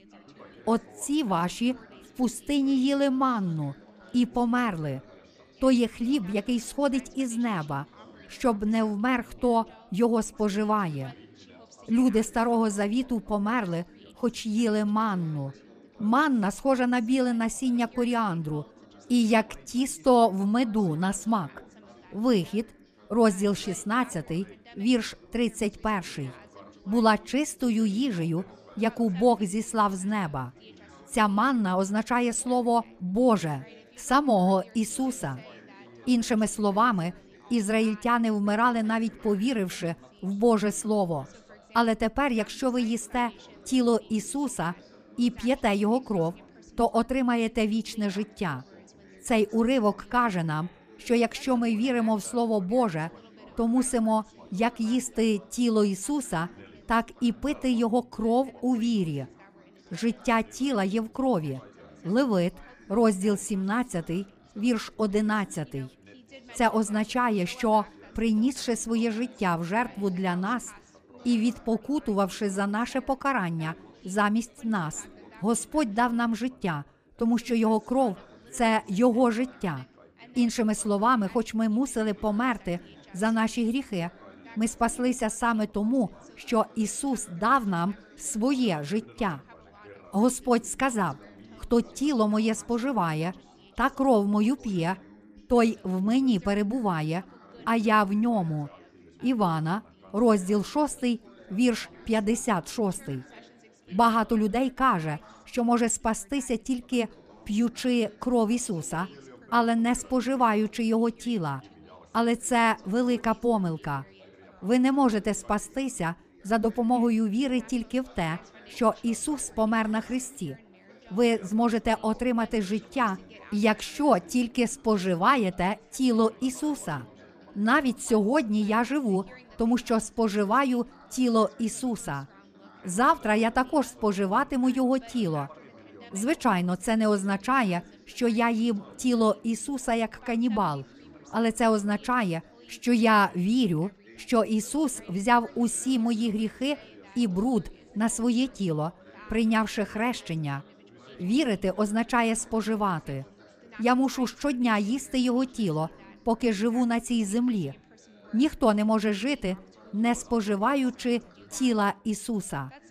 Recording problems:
background chatter; faint; throughout; 4 voices, 25 dB below the speech

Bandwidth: 15 kHz